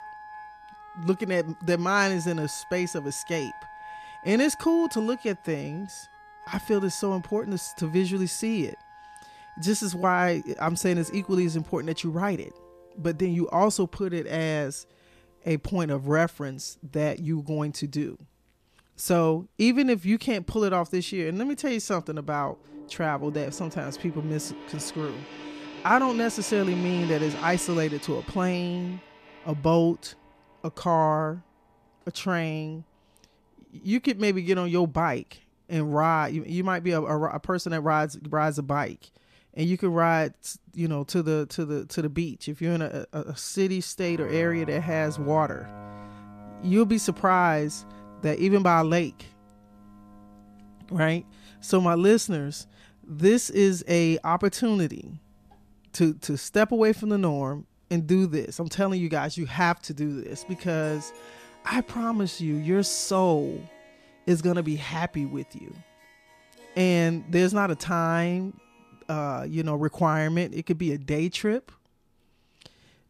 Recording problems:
background music; noticeable; throughout; 20 dB below the speech

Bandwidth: 14.5 kHz